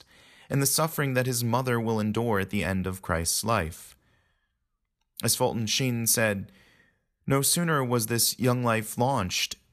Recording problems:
none

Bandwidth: 14 kHz